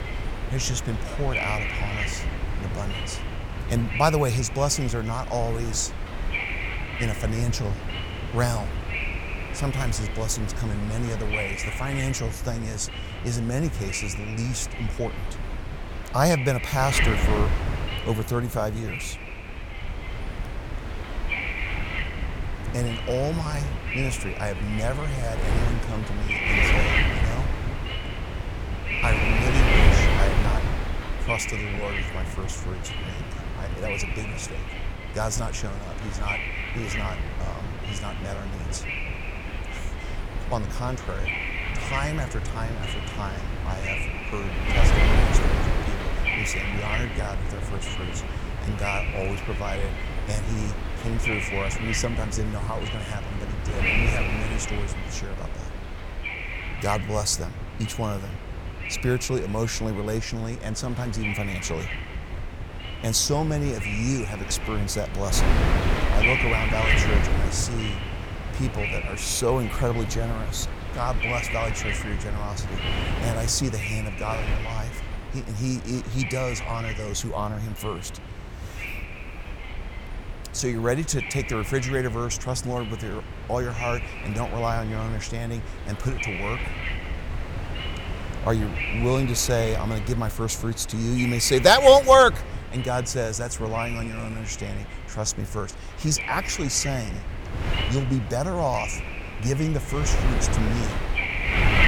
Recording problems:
wind noise on the microphone; heavy; 2 dB below the speech

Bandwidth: 18 kHz